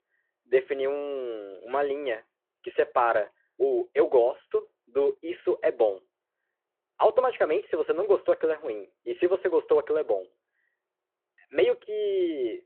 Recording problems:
phone-call audio

